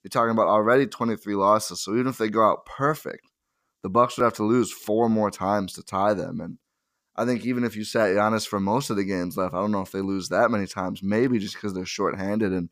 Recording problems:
none

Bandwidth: 15 kHz